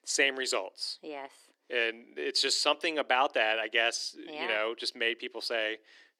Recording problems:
thin; very; fading below 300 Hz

